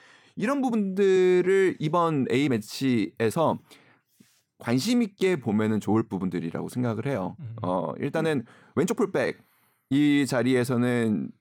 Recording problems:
uneven, jittery; strongly; from 0.5 to 10 s

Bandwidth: 17 kHz